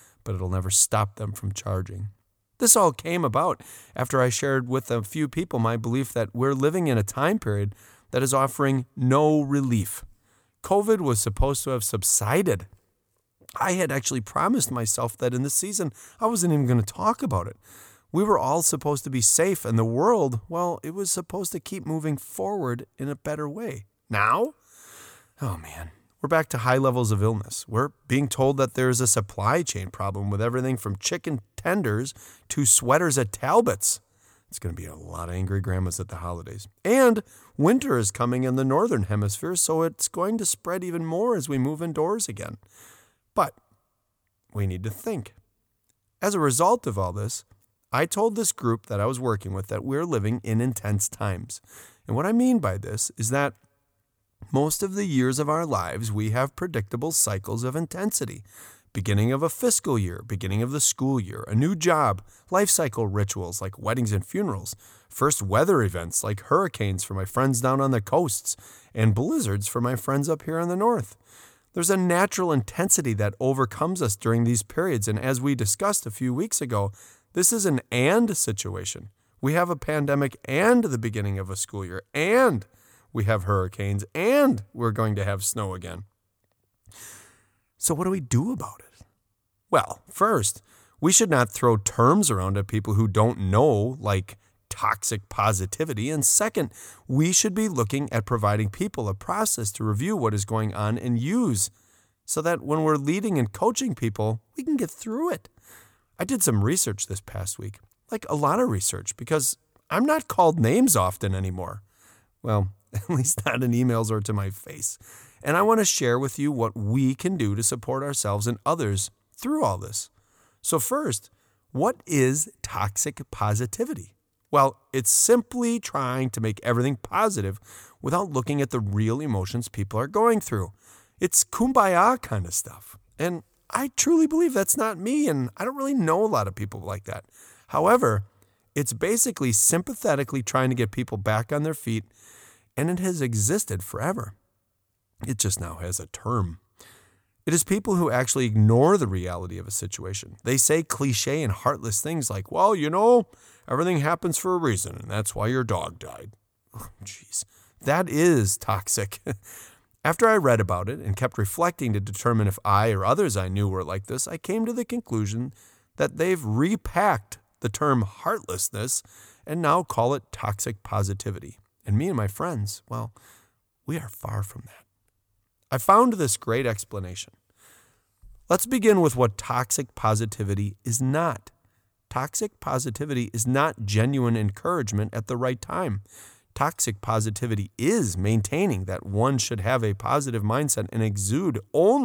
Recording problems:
abrupt cut into speech; at the end

